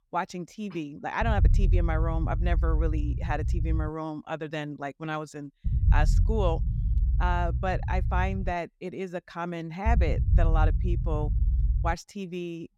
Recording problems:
low rumble; noticeable; from 1 to 4 s, from 5.5 to 8.5 s and from 10 to 12 s; 15 dB below the speech

